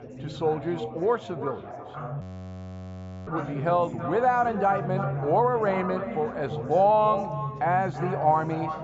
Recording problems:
echo of what is said; strong; throughout; 330 ms later, 10 dB below the speech
high frequencies cut off; noticeable; nothing above 8 kHz
muffled; very slightly; fading above 2 kHz
chatter from many people; noticeable; throughout; 10 dB below the speech
audio freezing; at 2 s for 1 s

